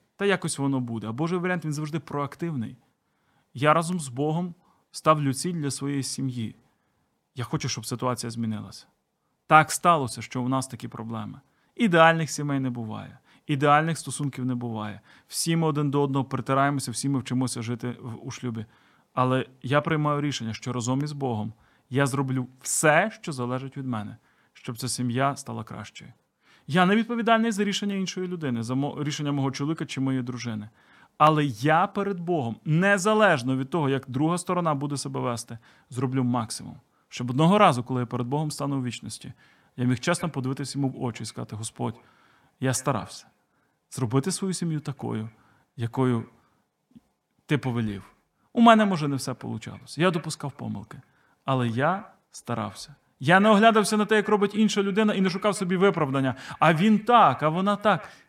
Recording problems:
echo of what is said; faint; from 40 s on; 120 ms later, 20 dB below the speech

